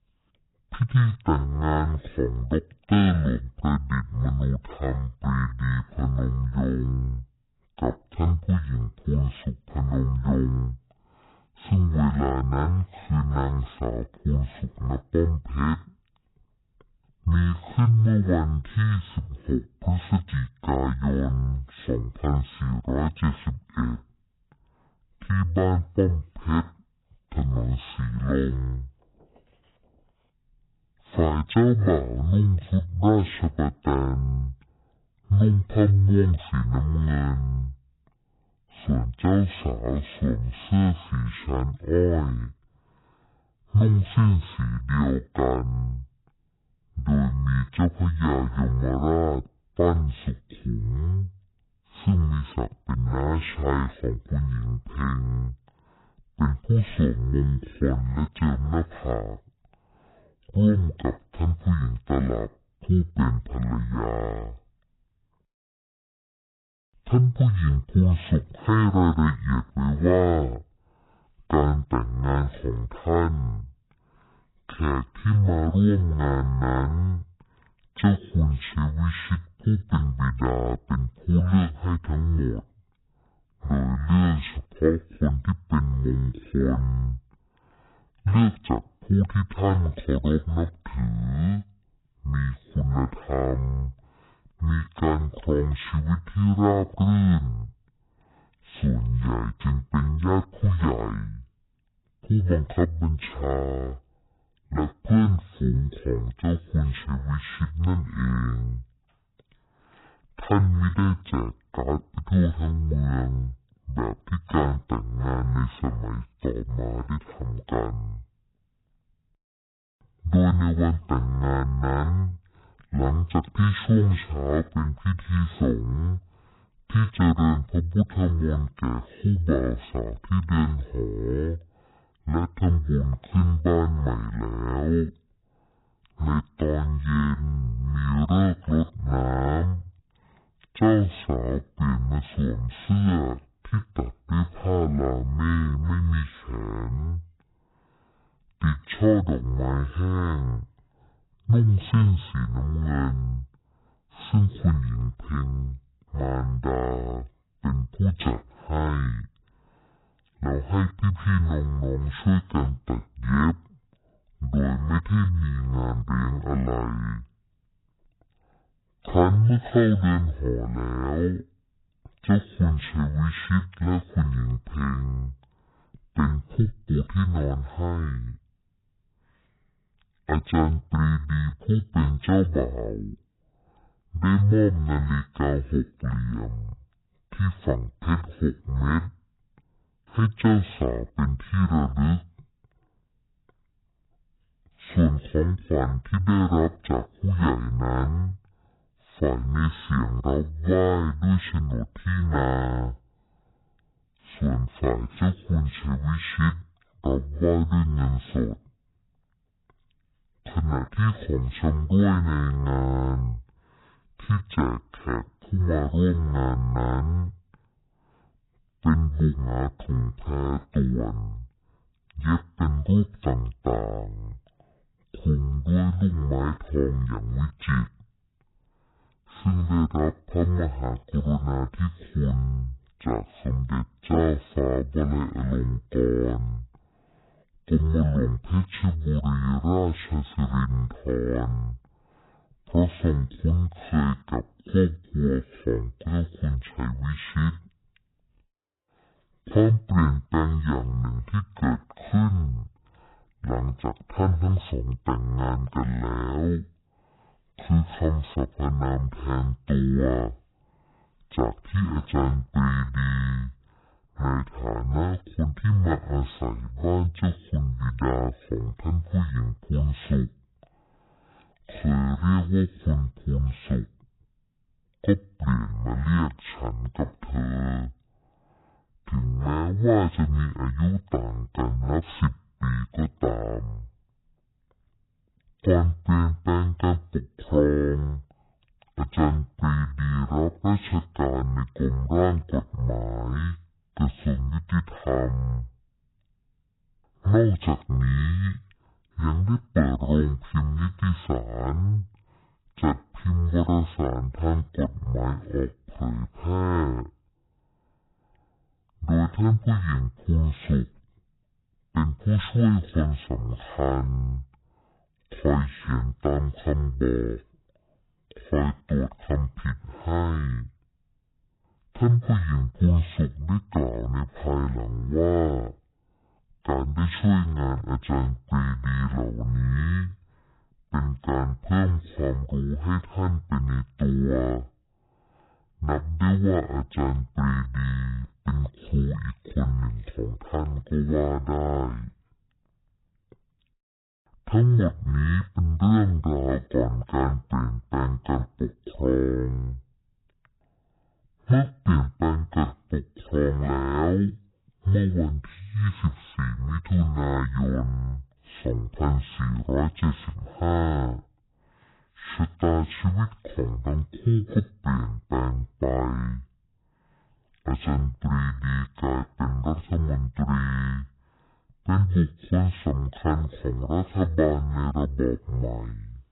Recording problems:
garbled, watery; badly; nothing above 4 kHz
wrong speed and pitch; too slow and too low; 0.5 times normal speed

